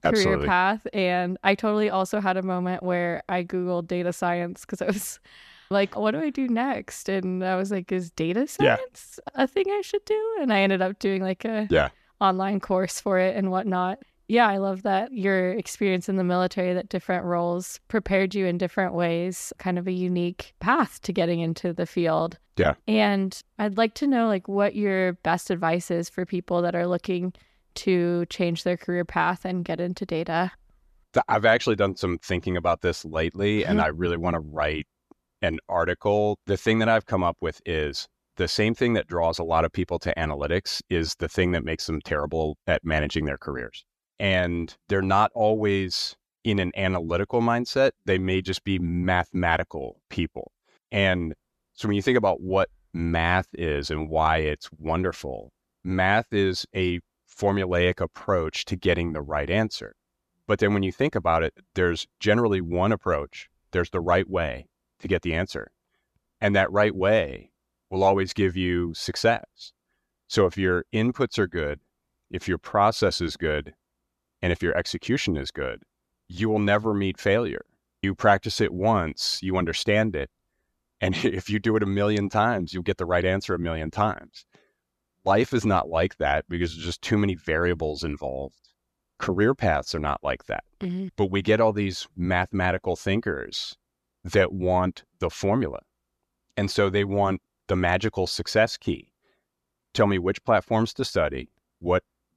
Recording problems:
none

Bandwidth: 14 kHz